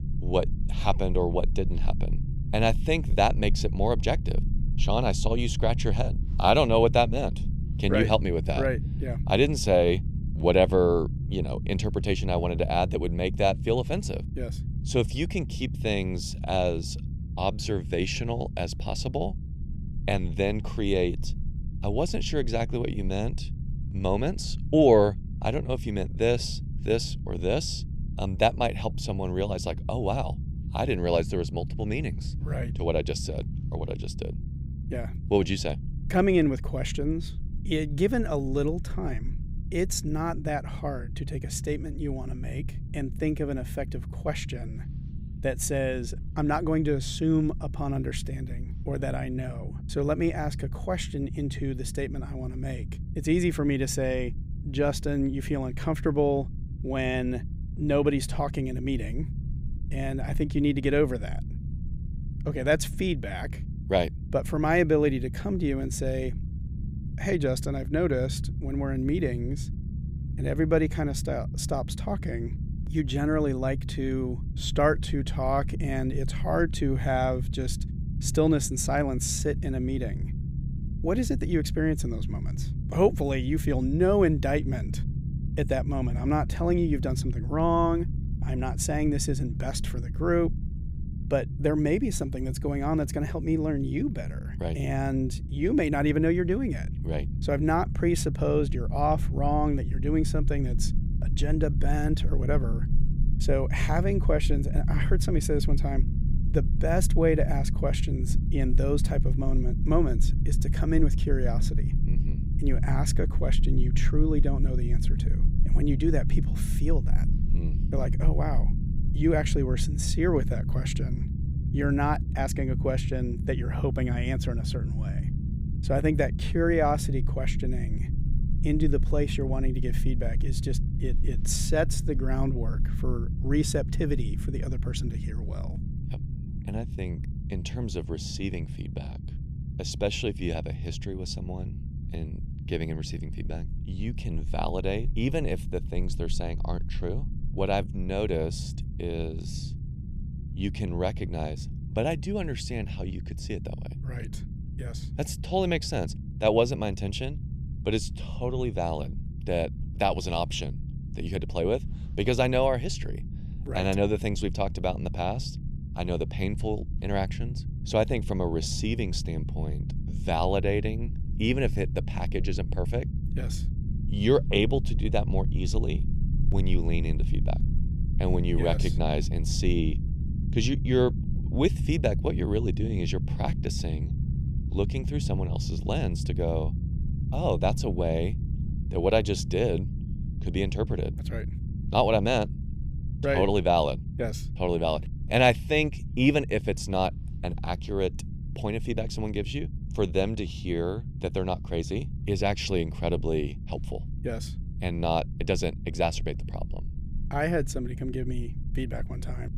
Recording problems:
low rumble; noticeable; throughout; 15 dB below the speech

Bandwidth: 15.5 kHz